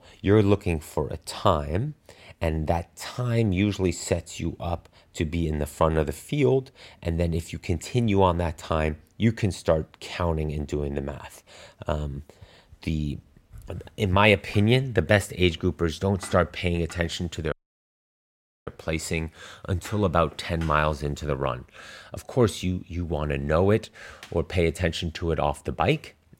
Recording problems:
audio cutting out; at 18 s for 1 s

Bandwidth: 16 kHz